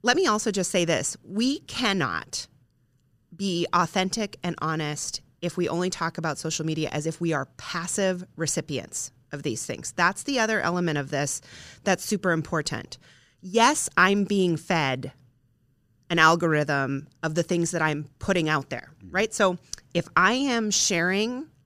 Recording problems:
none

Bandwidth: 15 kHz